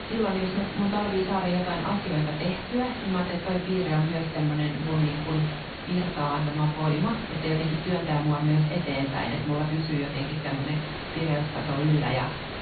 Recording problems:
off-mic speech; far
high frequencies cut off; severe; nothing above 4.5 kHz
room echo; slight; dies away in 0.4 s
hiss; loud; throughout; 8 dB below the speech

